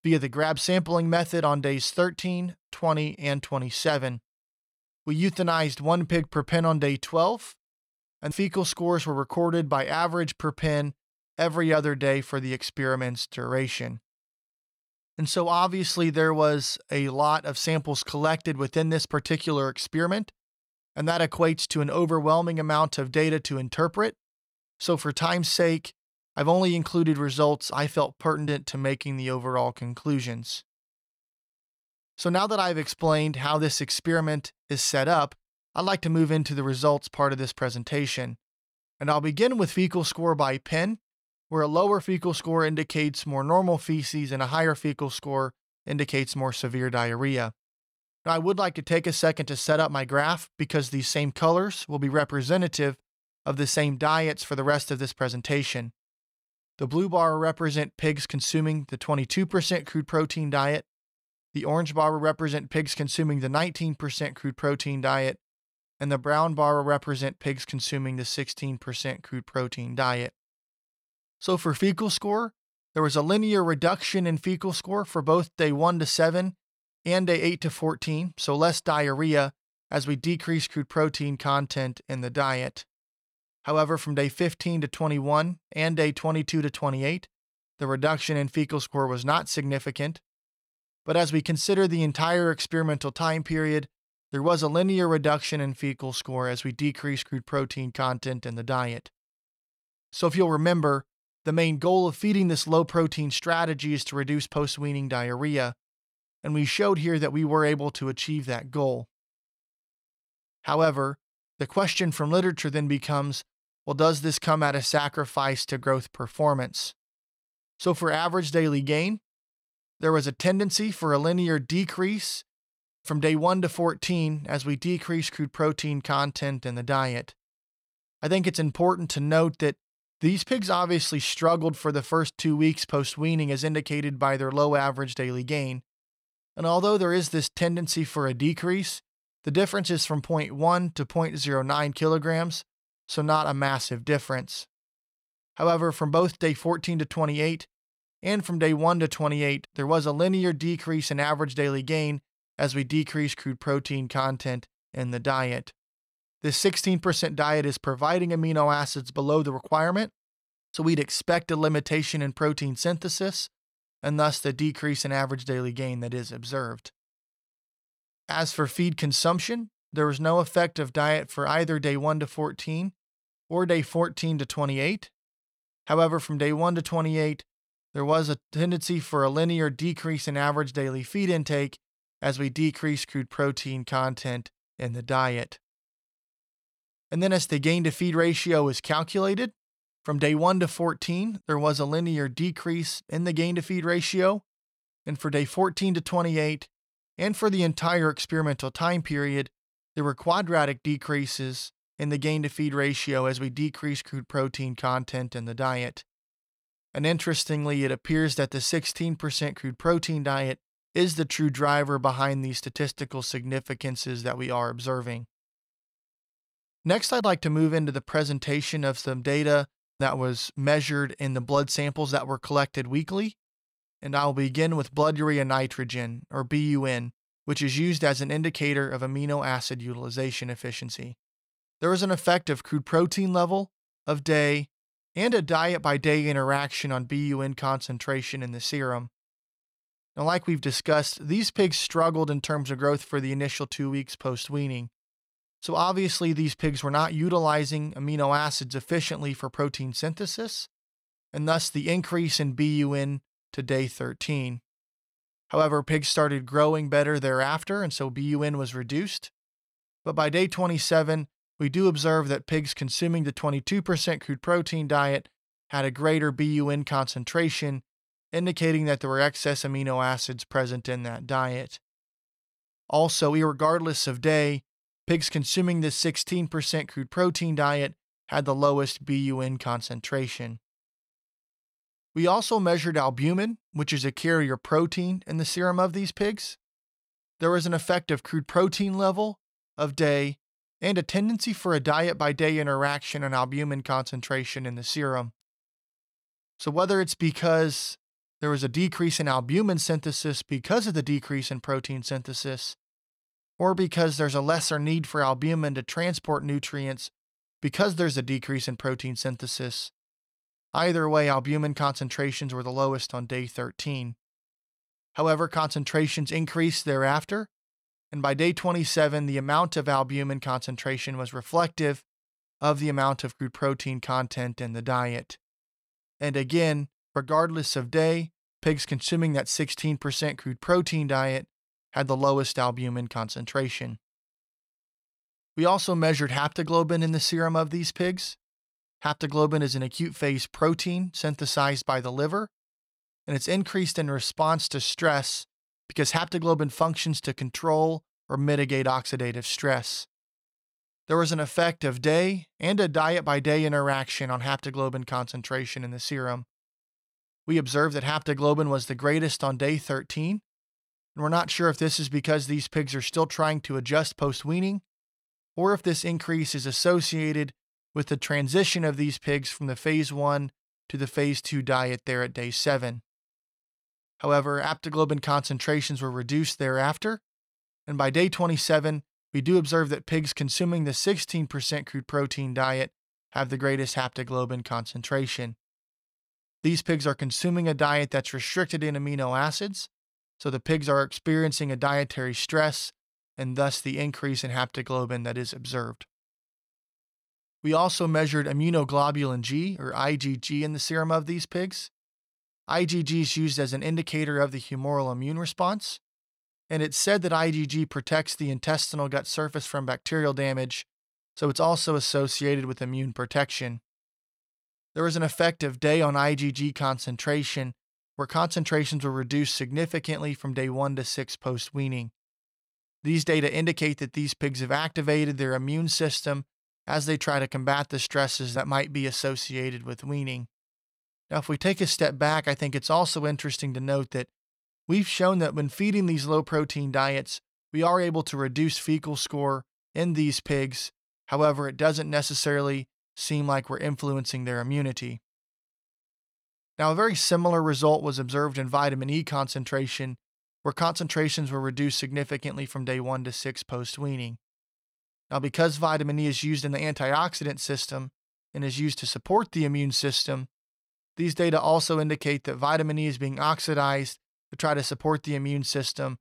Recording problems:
none

